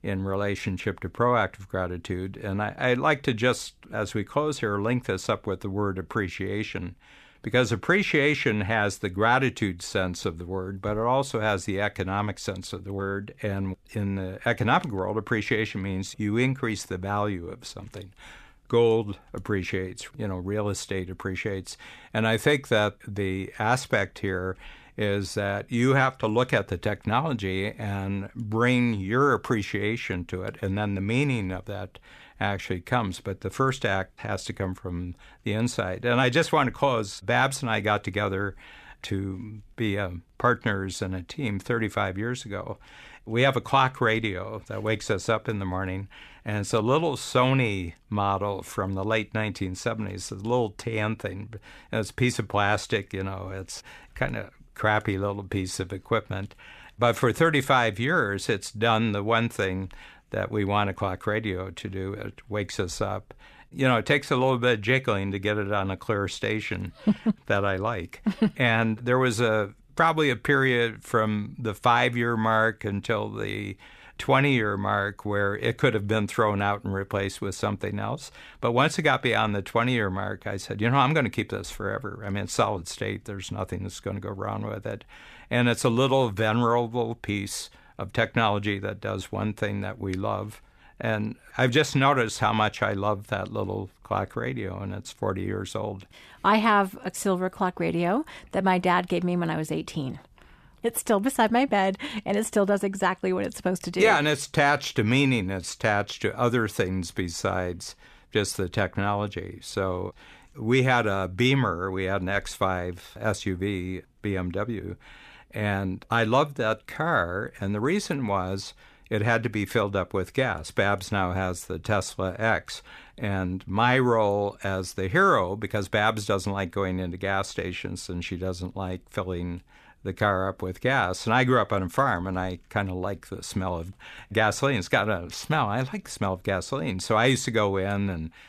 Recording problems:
none

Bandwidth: 14.5 kHz